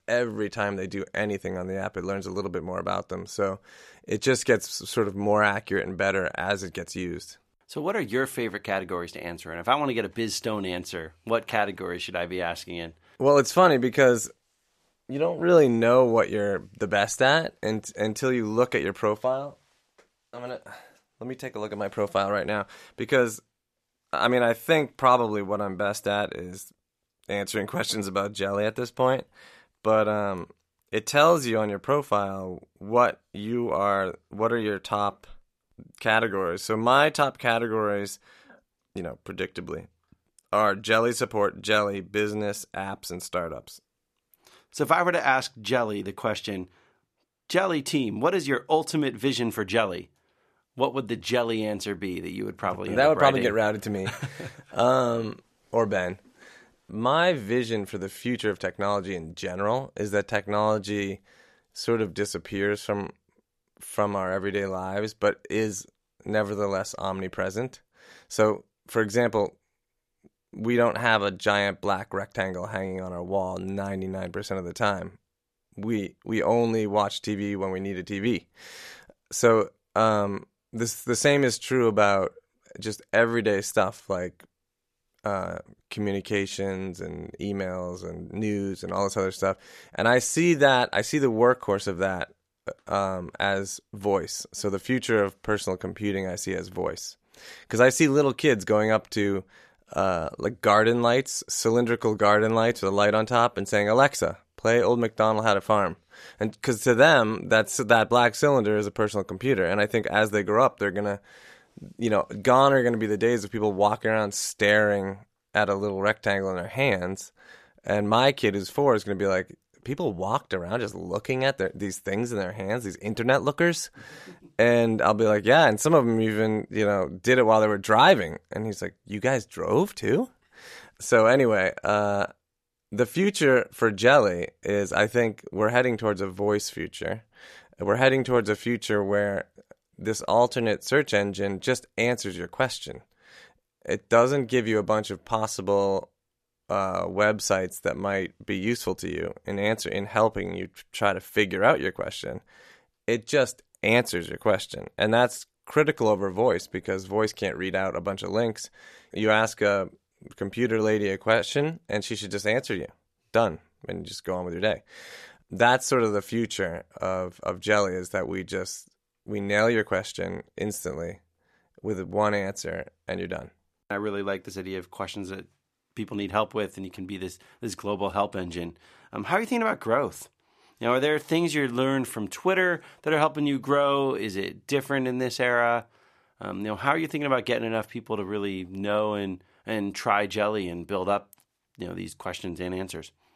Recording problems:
none

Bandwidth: 14 kHz